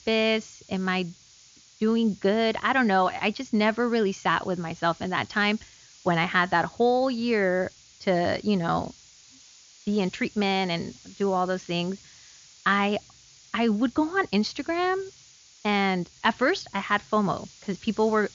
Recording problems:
high frequencies cut off; noticeable; nothing above 7 kHz
hiss; faint; throughout; 25 dB below the speech

